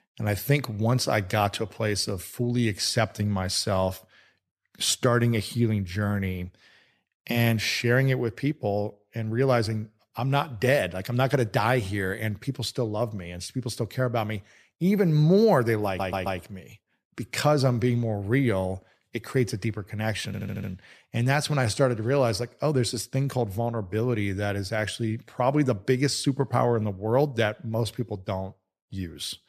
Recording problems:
audio stuttering; at 16 s and at 20 s

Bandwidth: 14.5 kHz